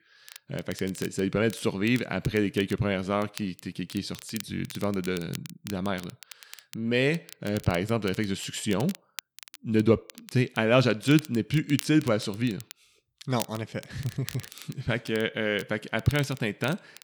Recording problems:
crackle, like an old record; noticeable; 15 dB below the speech

